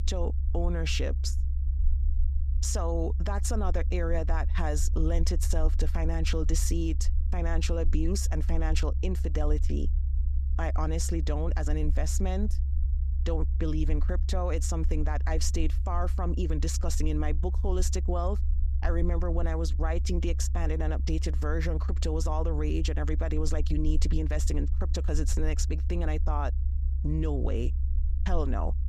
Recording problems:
low rumble; noticeable; throughout; 15 dB below the speech

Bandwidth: 14.5 kHz